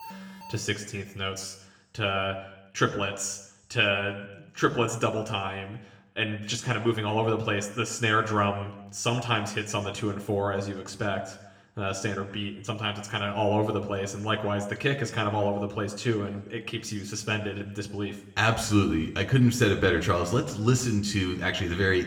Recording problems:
room echo; very slight; dies away in 0.8 s
off-mic speech; somewhat distant
alarm; faint; at the start; peak 15 dB below the speech

